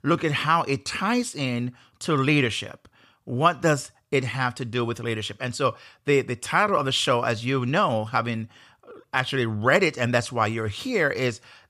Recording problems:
none

